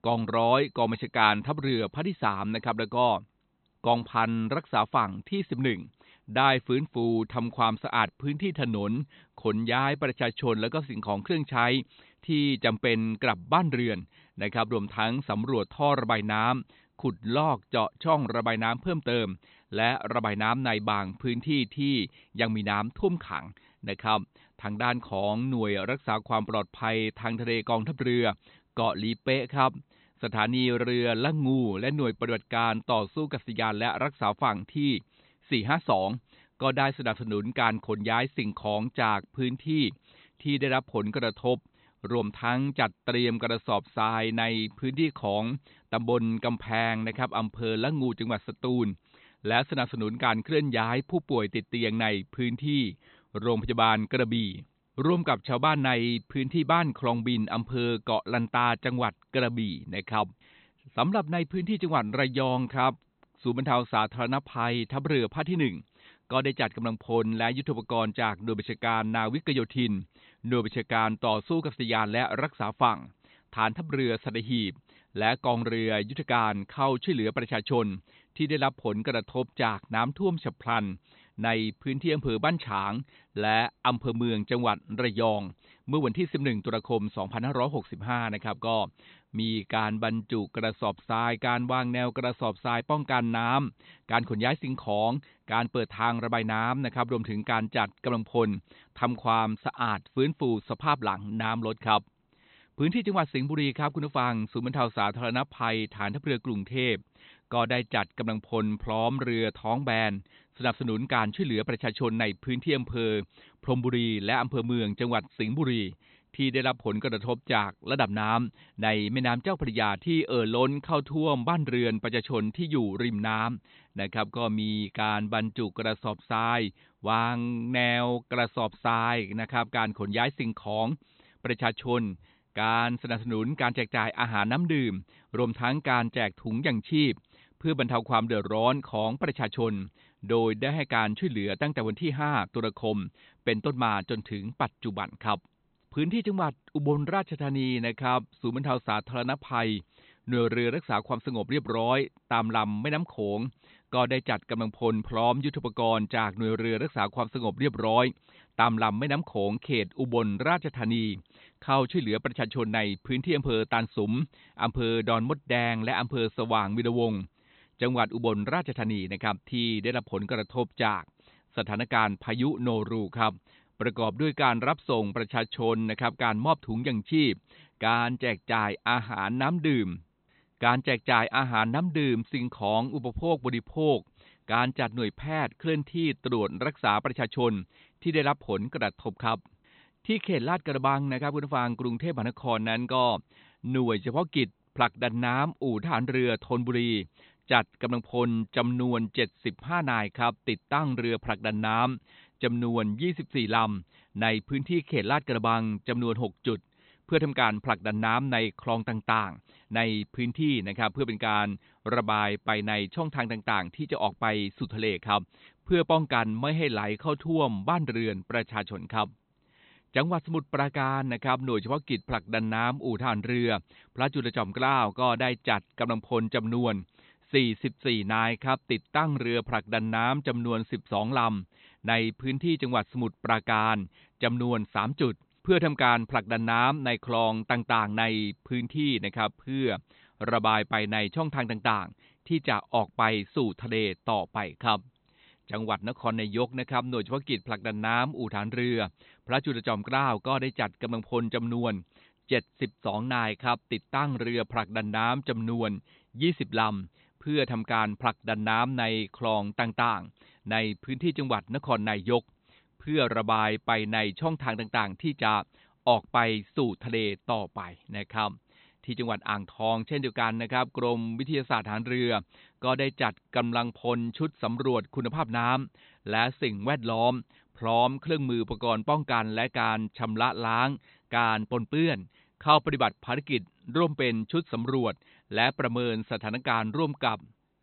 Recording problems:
high frequencies cut off; severe; nothing above 4 kHz

